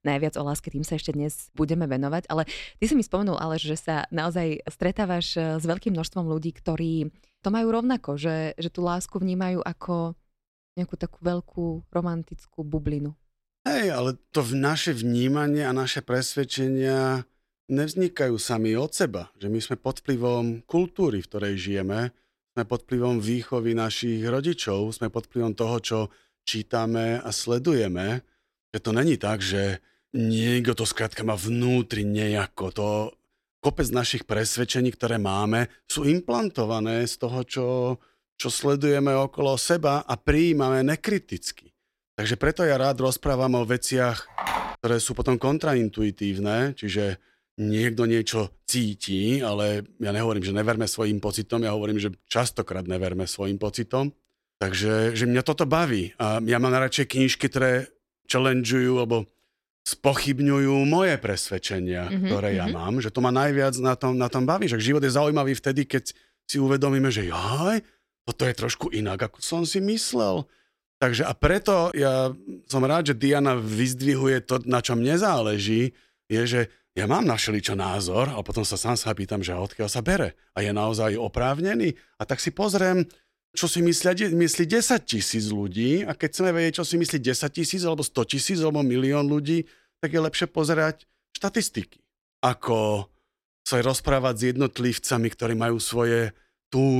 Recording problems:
phone ringing; noticeable; at 44 s; peak 3 dB below the speech
abrupt cut into speech; at the end

